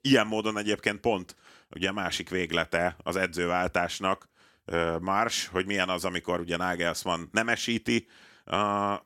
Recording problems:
none

